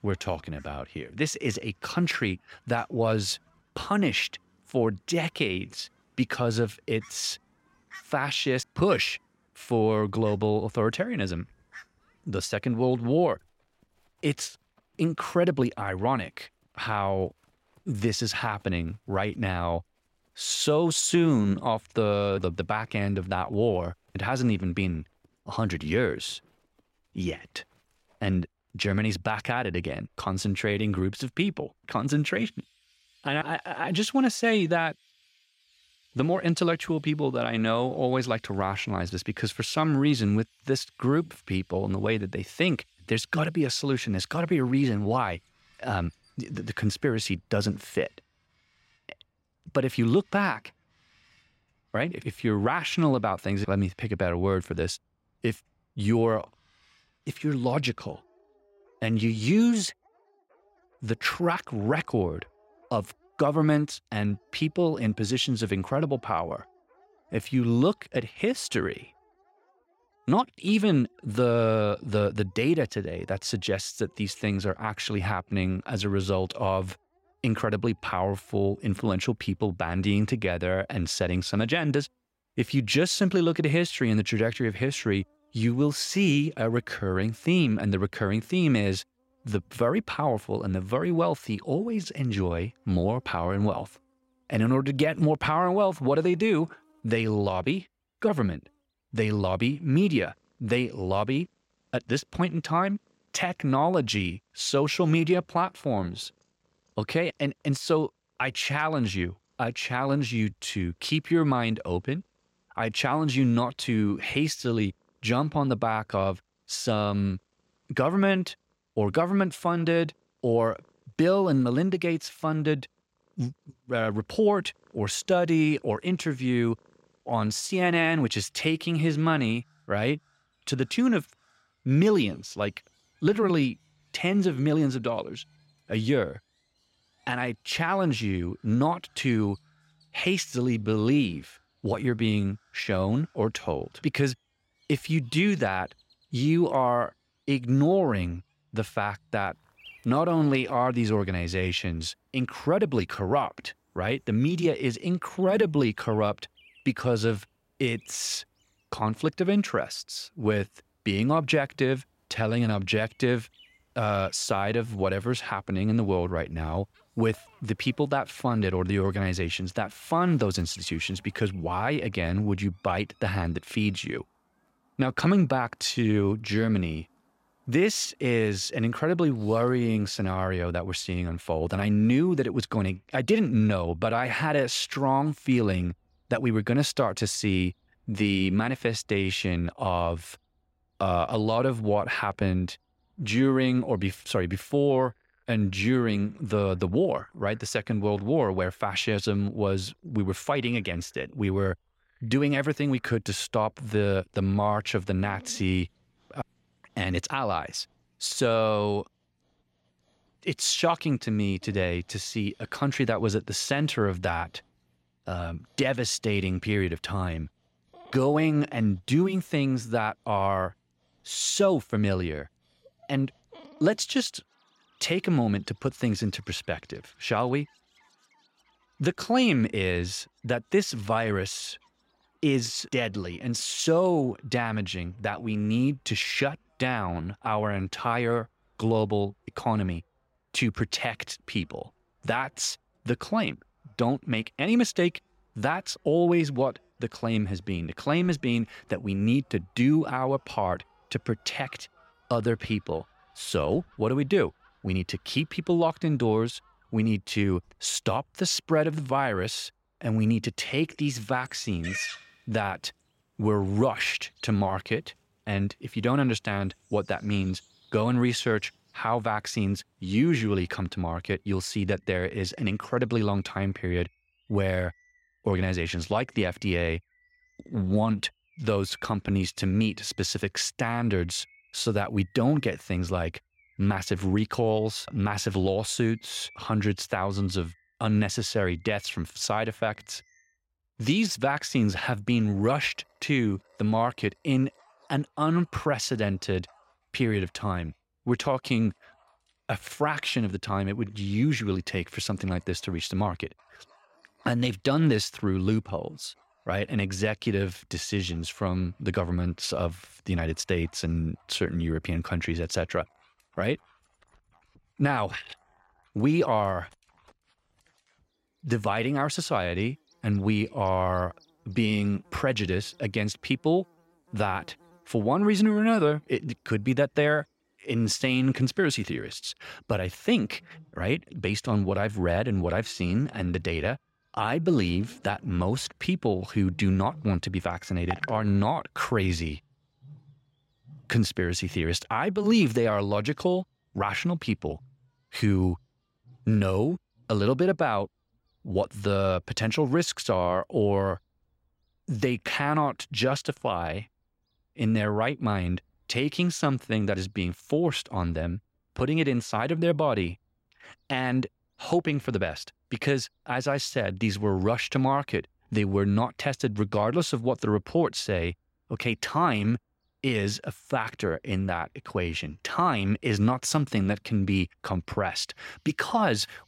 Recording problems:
animal sounds; faint; throughout; 30 dB below the speech

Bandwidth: 16 kHz